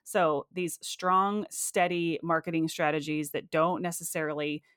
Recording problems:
none

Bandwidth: 17.5 kHz